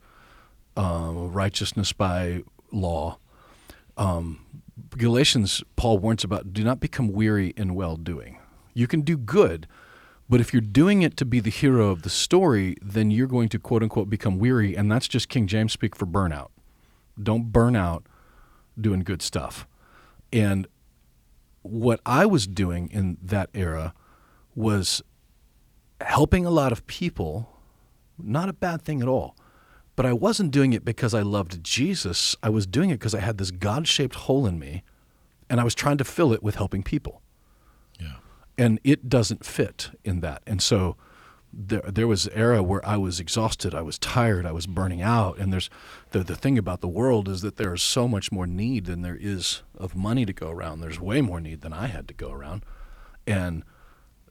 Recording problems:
none

